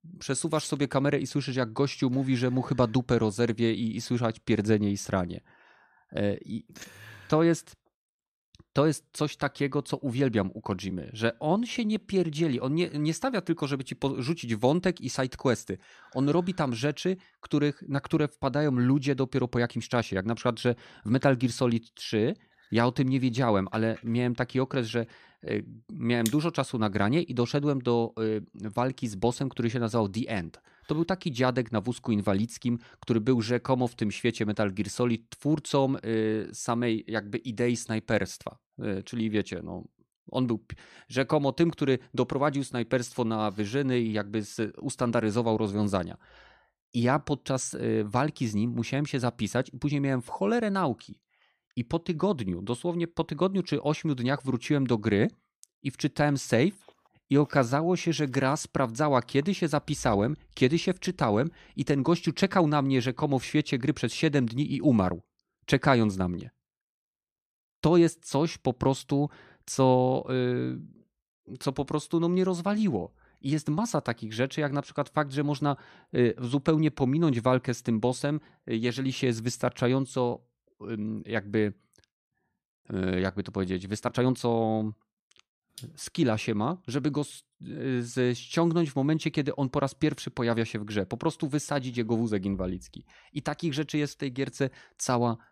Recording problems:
uneven, jittery; strongly; from 11 s to 1:25

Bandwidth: 14.5 kHz